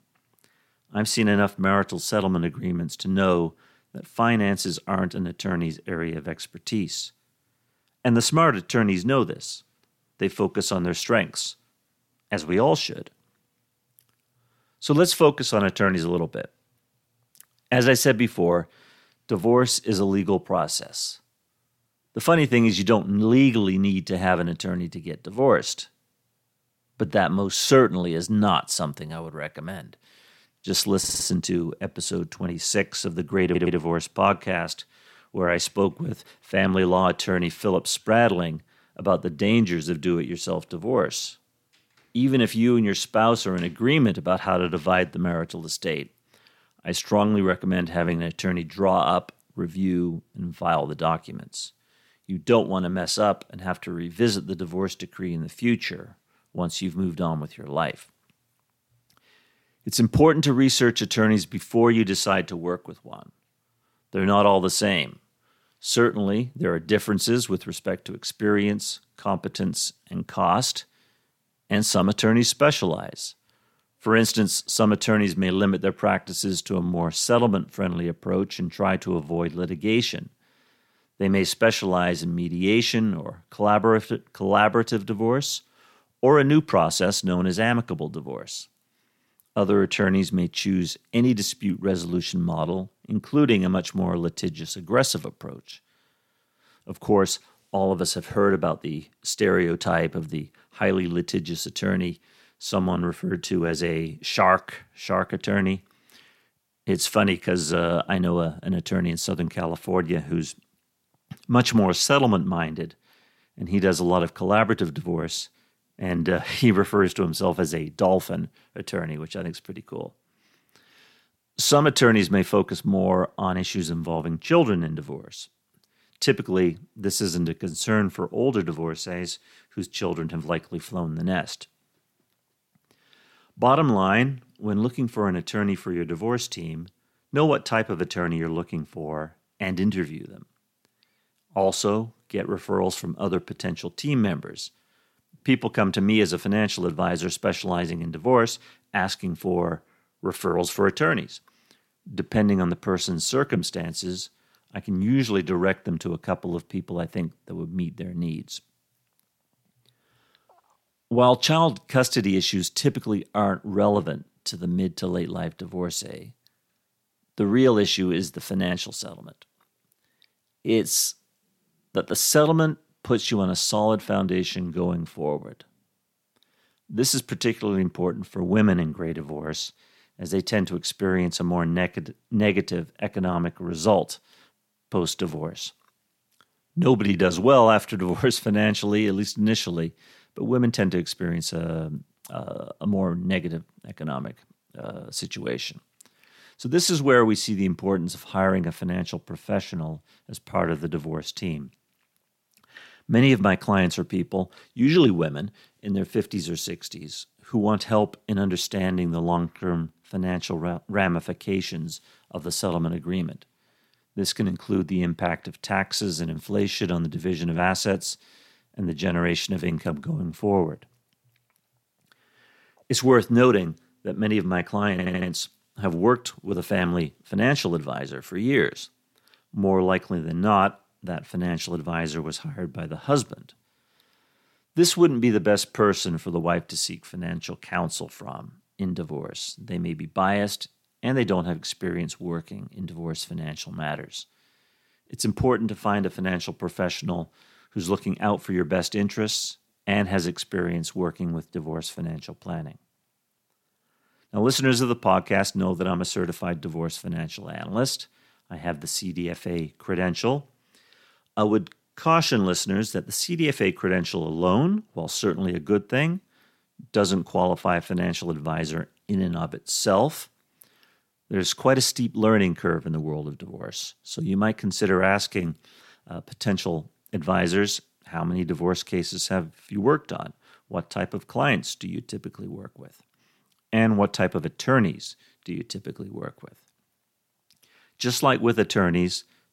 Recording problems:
audio stuttering; at 31 s, at 33 s and at 3:45

